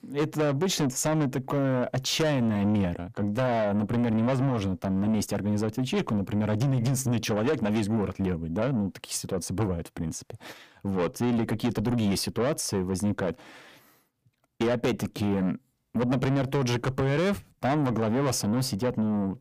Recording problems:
distortion; heavy; 7 dB below the speech

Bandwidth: 15 kHz